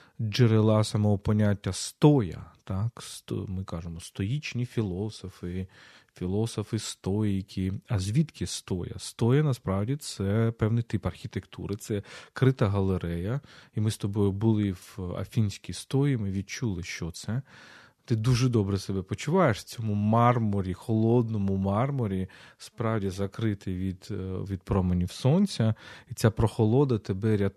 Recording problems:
none

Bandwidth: 13.5 kHz